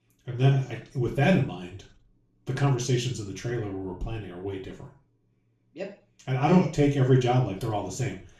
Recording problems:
off-mic speech; far
room echo; noticeable; dies away in 0.3 s

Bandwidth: 13.5 kHz